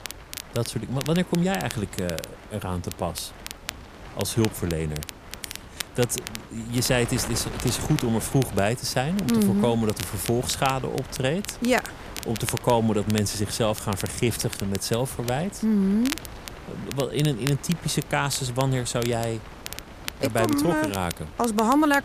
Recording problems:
wind noise on the microphone; occasional gusts; 15 dB below the speech
crackle, like an old record; noticeable; 10 dB below the speech

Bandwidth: 14.5 kHz